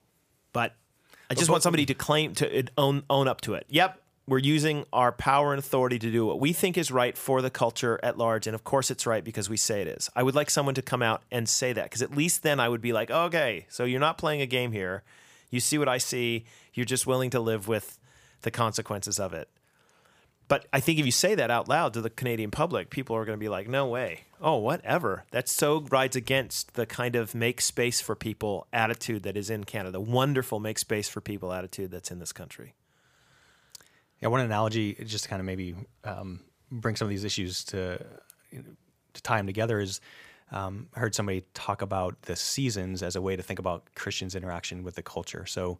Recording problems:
none

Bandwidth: 15 kHz